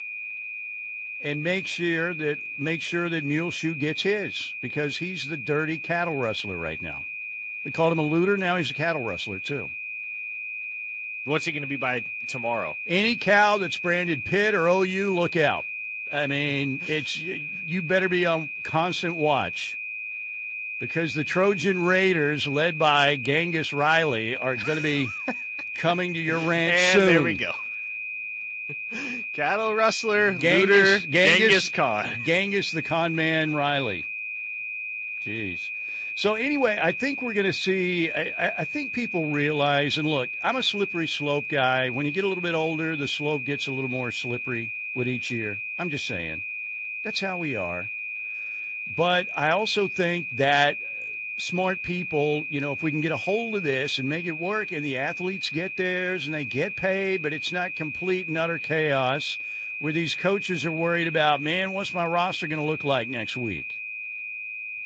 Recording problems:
garbled, watery; slightly; nothing above 7.5 kHz
high-pitched whine; loud; throughout; 2.5 kHz, 6 dB below the speech

